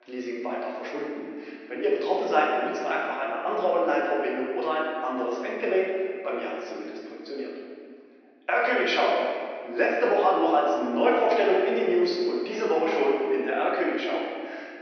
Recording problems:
off-mic speech; far
room echo; noticeable; dies away in 1.9 s
thin; somewhat; fading below 350 Hz
high frequencies cut off; noticeable; nothing above 6 kHz

